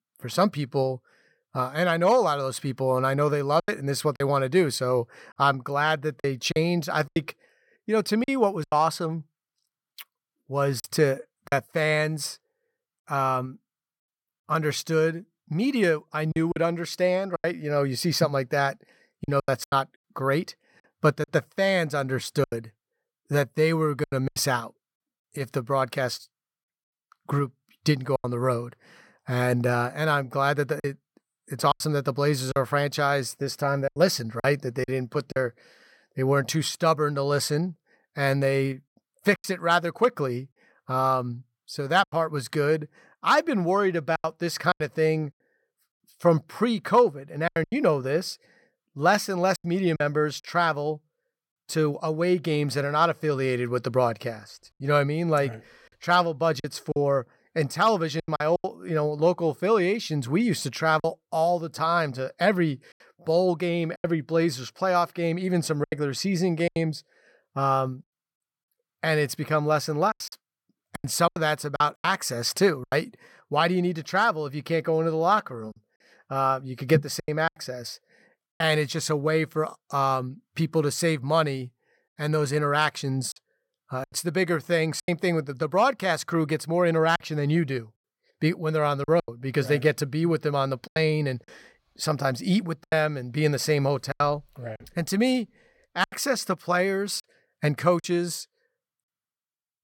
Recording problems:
choppy; very; 6% of the speech affected

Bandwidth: 17 kHz